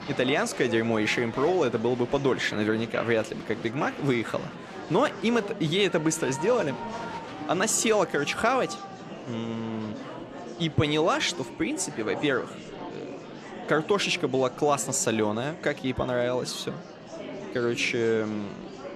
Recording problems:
murmuring crowd; noticeable; throughout; 10 dB below the speech

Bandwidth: 14 kHz